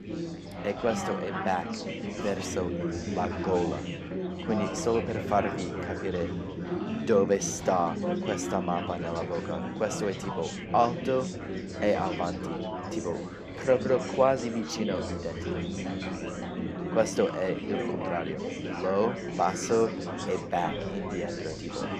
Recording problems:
chatter from many people; loud; throughout; 4 dB below the speech

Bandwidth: 14.5 kHz